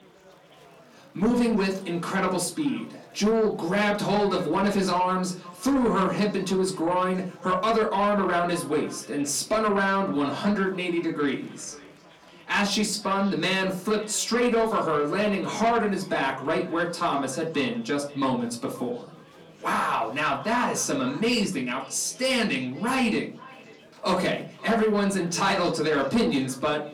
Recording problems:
off-mic speech; far
echo of what is said; faint; throughout; 530 ms later, 20 dB below the speech
distortion; slight; 10 dB below the speech
room echo; very slight; dies away in 0.3 s
chatter from many people; faint; throughout; 25 dB below the speech

